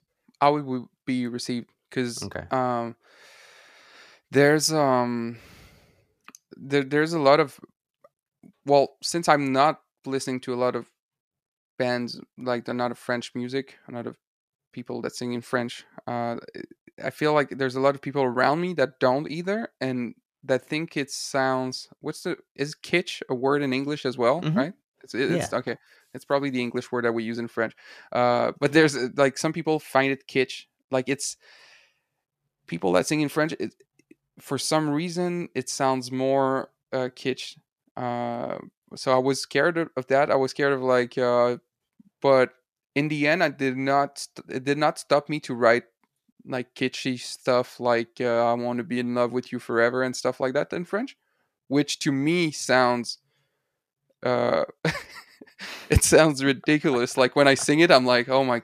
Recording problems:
none

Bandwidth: 14.5 kHz